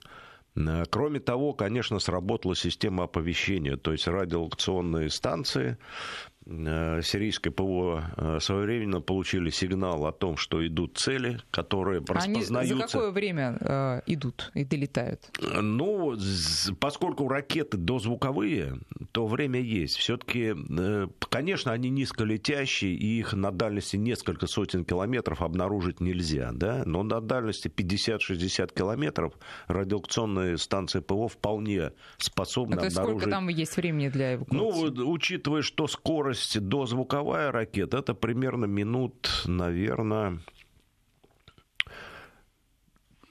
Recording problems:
squashed, flat; somewhat

